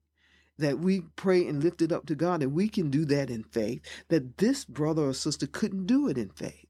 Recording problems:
none

